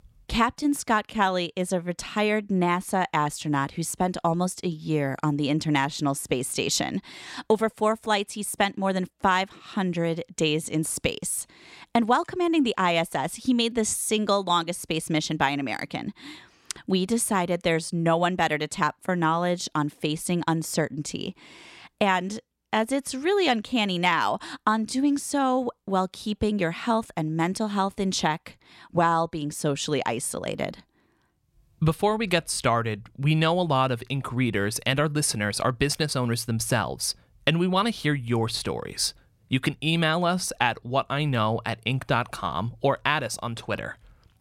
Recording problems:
none

